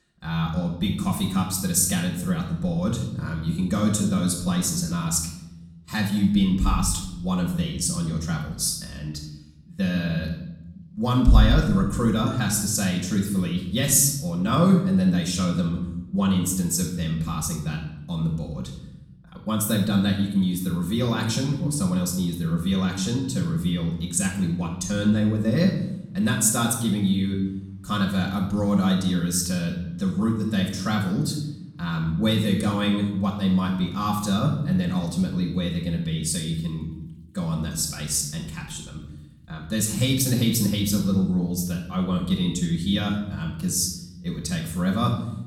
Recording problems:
room echo; noticeable; dies away in 0.8 s
off-mic speech; somewhat distant
rain or running water; very faint; throughout; 25 dB below the speech

